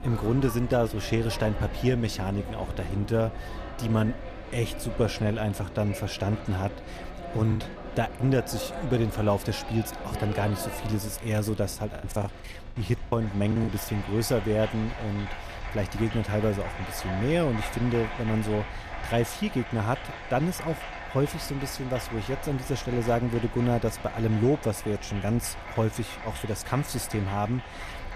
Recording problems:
crowd noise; noticeable; throughout; 10 dB below the speech
wind noise on the microphone; occasional gusts; 25 dB below the speech
choppy; very; at 7.5 s and from 12 to 14 s; 15% of the speech affected

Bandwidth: 14.5 kHz